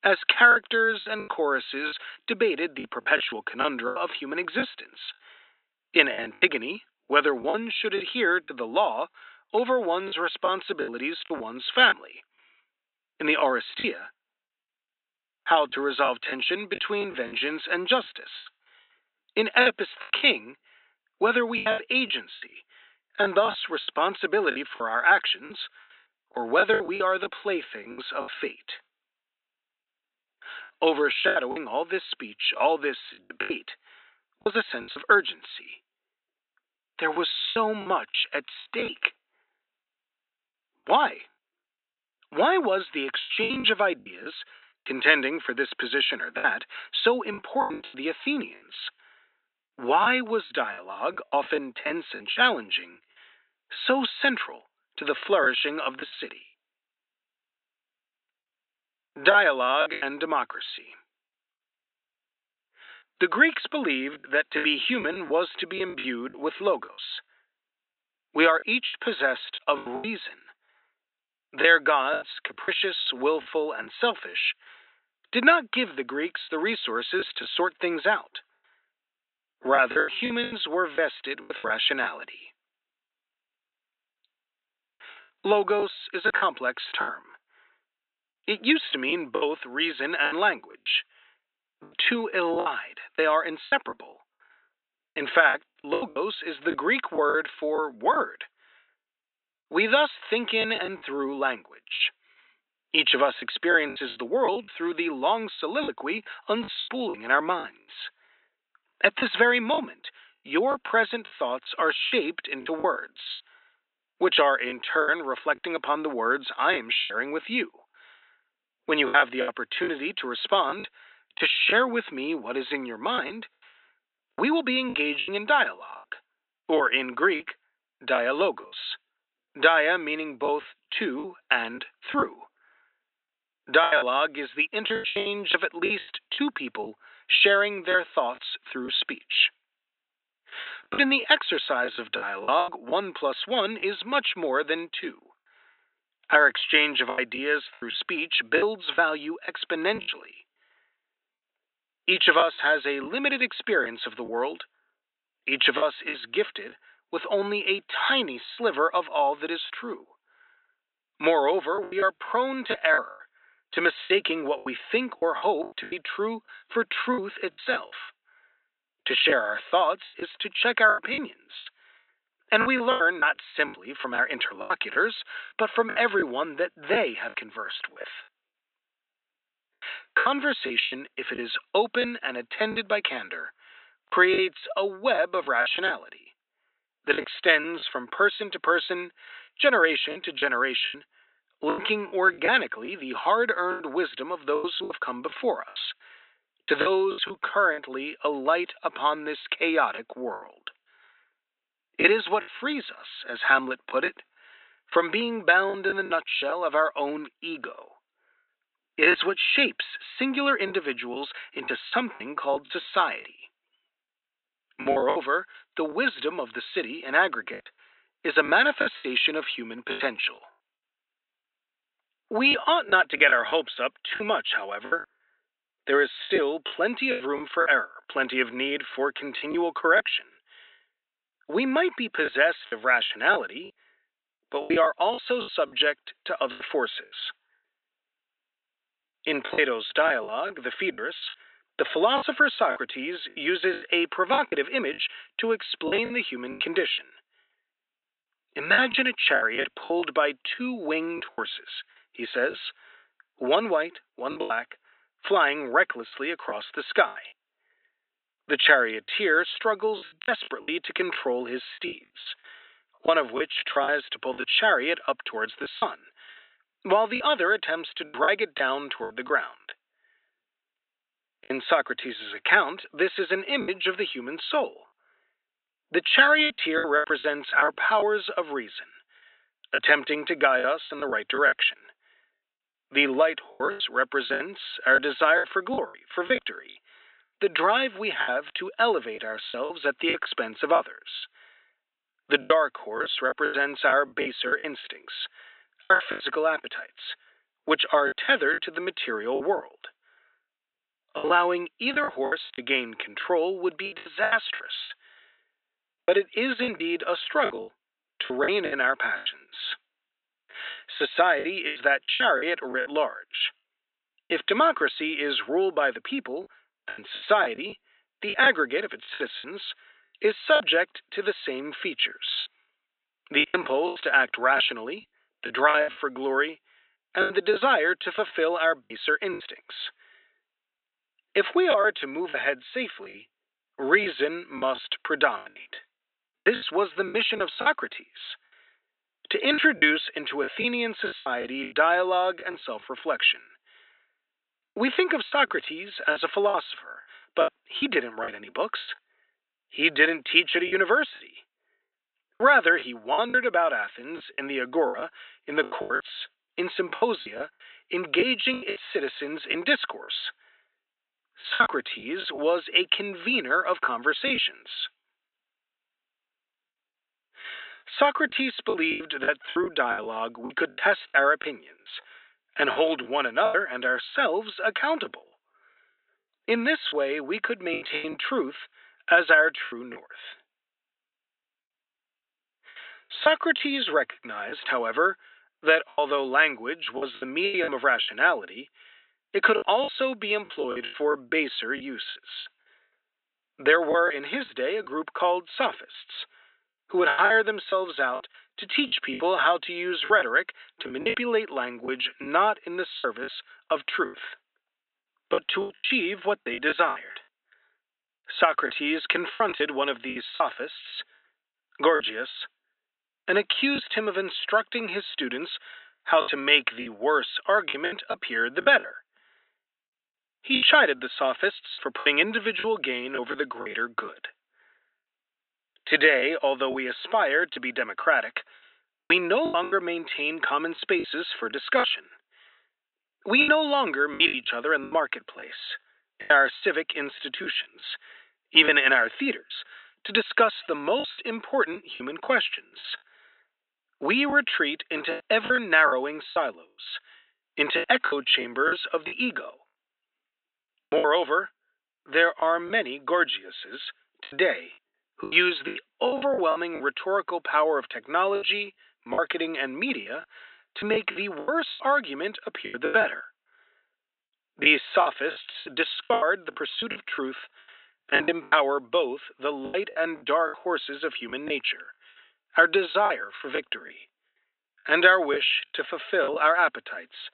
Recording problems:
high frequencies cut off; severe; nothing above 4 kHz
thin; somewhat; fading below 250 Hz
choppy; very; 10% of the speech affected

